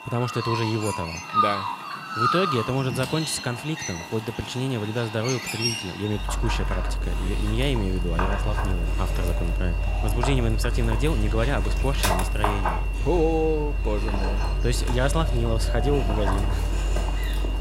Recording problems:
animal sounds; very loud; throughout; 1 dB above the speech
high-pitched whine; noticeable; throughout; 2.5 kHz, 15 dB below the speech

